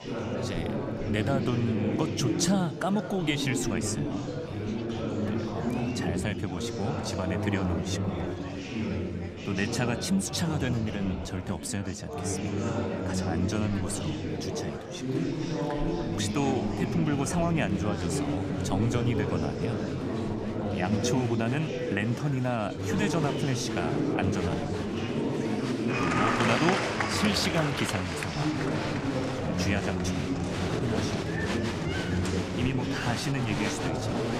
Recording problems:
murmuring crowd; very loud; throughout; 1 dB above the speech

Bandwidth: 15 kHz